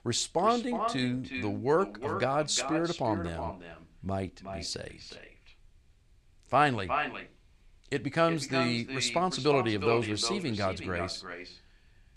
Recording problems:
echo of what is said; strong; throughout; 360 ms later, 7 dB below the speech

